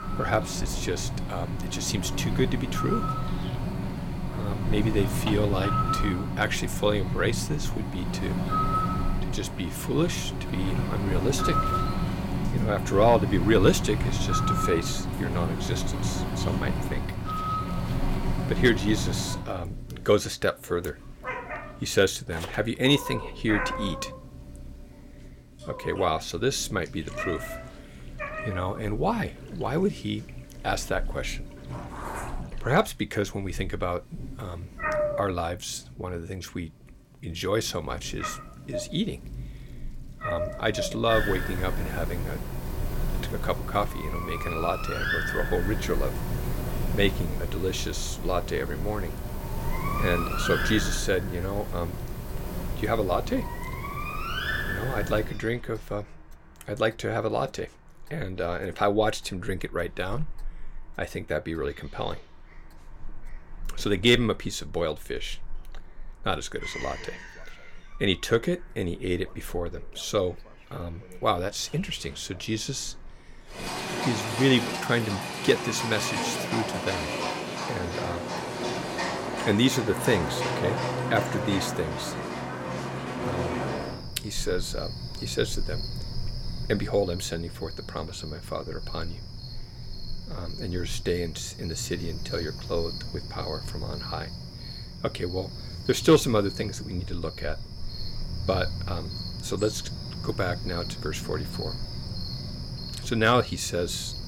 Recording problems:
animal sounds; loud; throughout; 3 dB below the speech
household noises; faint; throughout; 20 dB below the speech

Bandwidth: 16.5 kHz